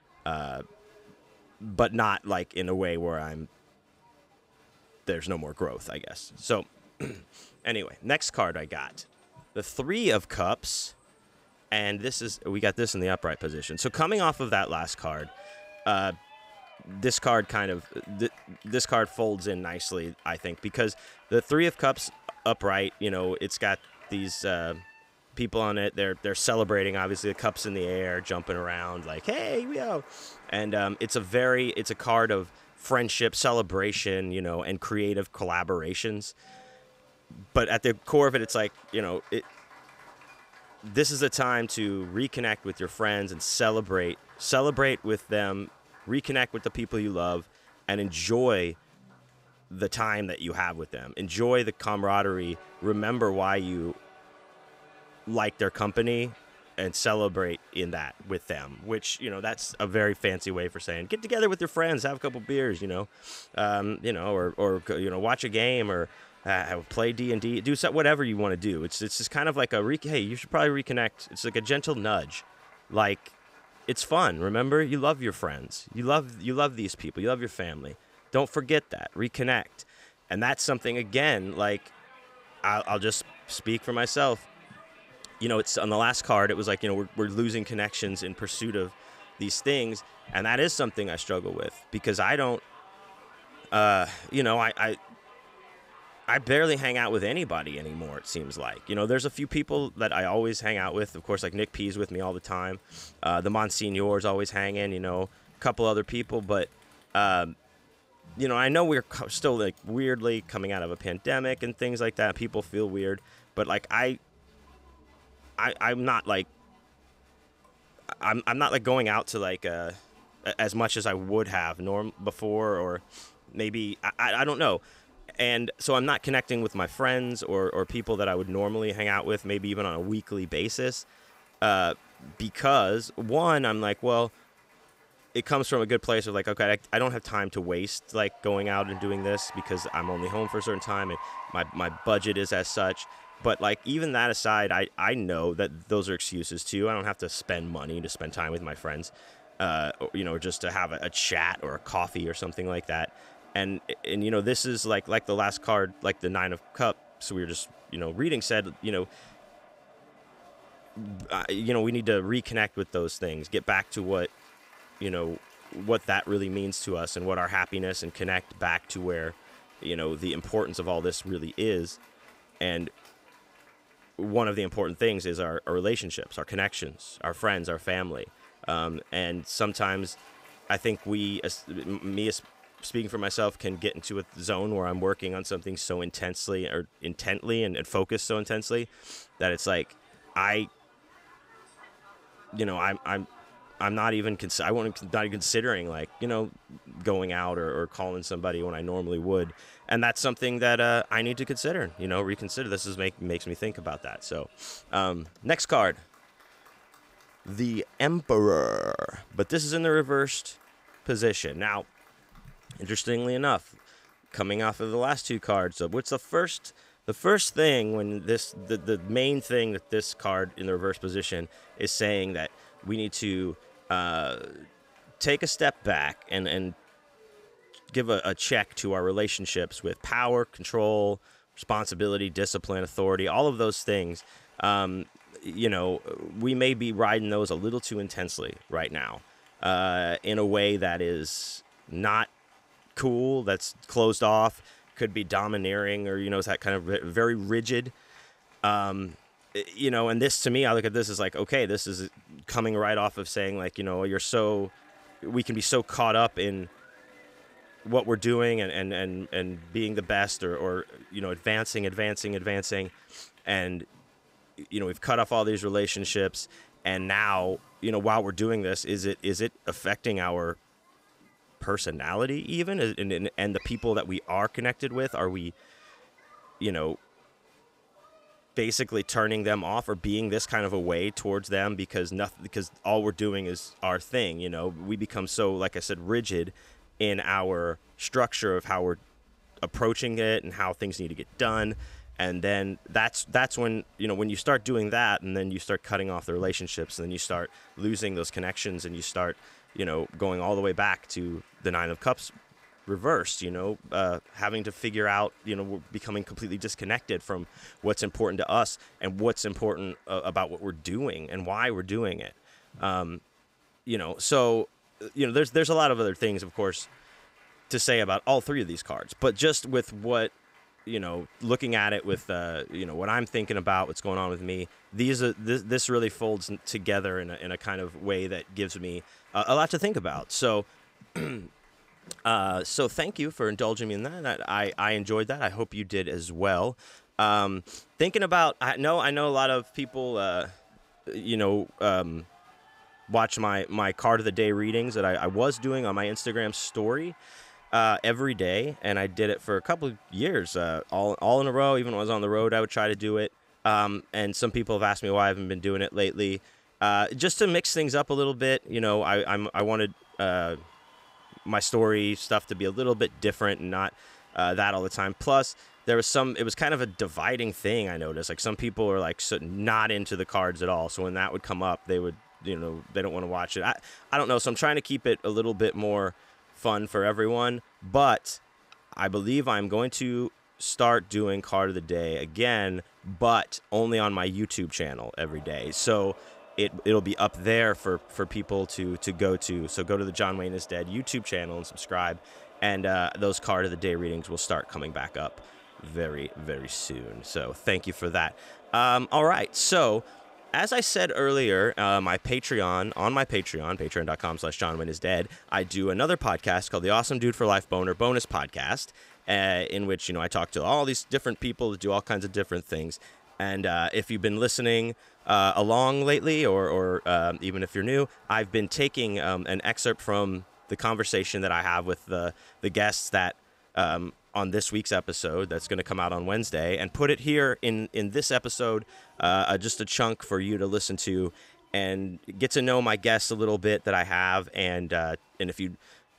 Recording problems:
crowd noise; faint; throughout; 25 dB below the speech

